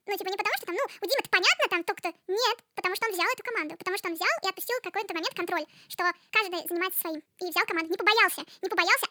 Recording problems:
wrong speed and pitch; too fast and too high; 1.6 times normal speed

